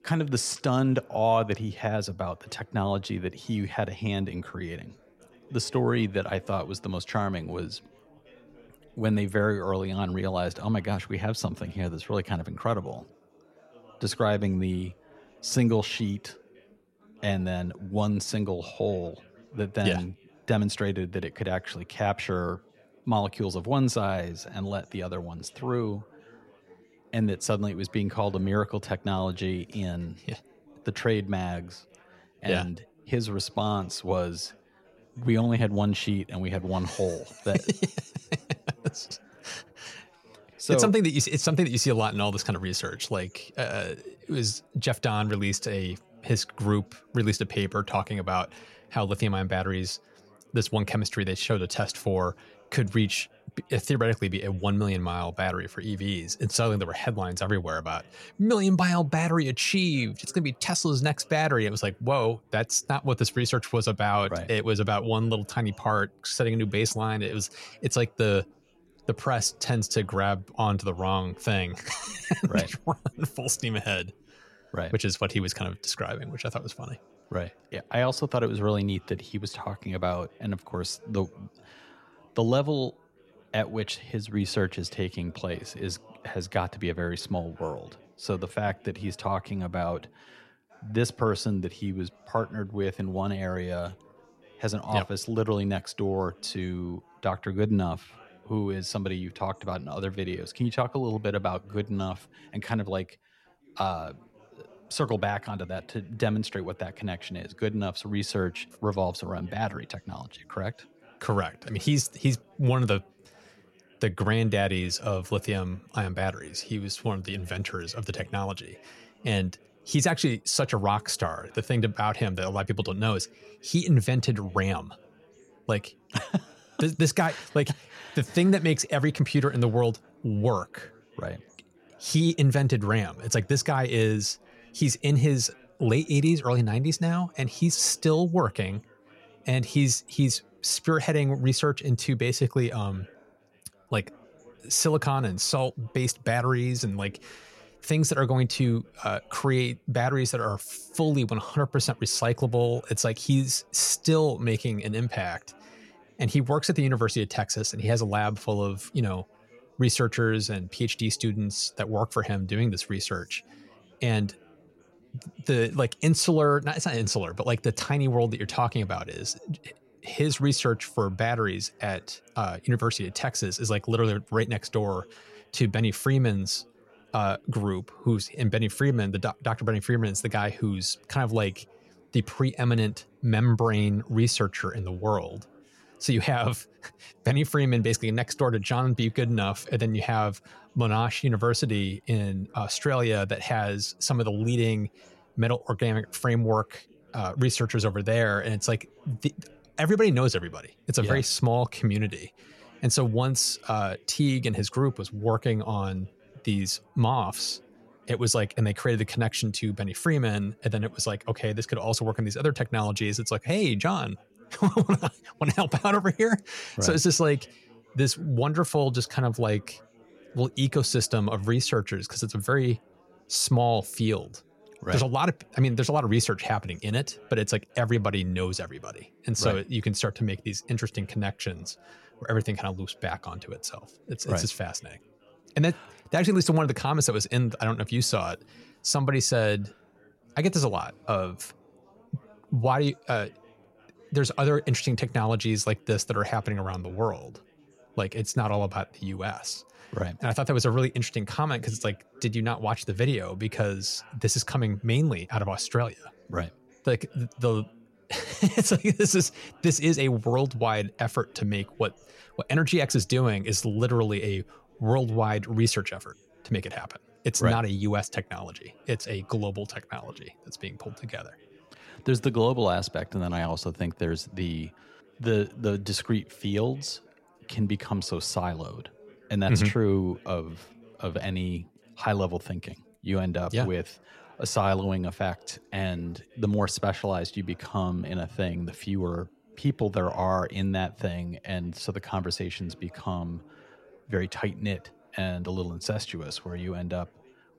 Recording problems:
background chatter; faint; throughout; 4 voices, 30 dB below the speech

